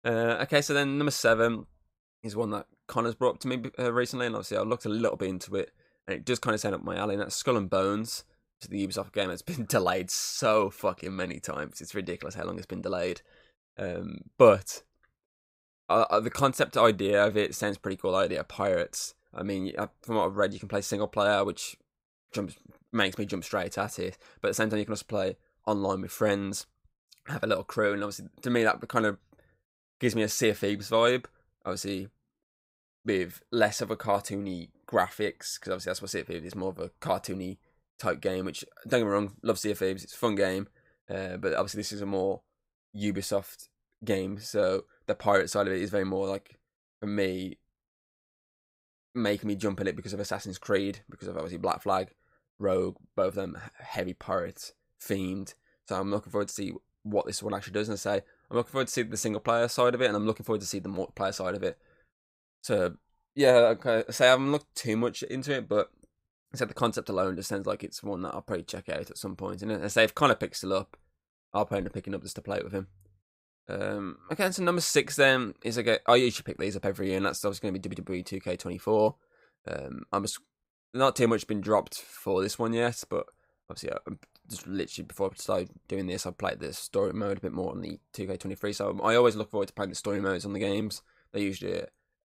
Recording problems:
none

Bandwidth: 15.5 kHz